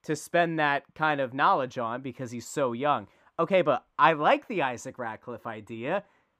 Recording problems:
muffled; slightly; fading above 2 kHz

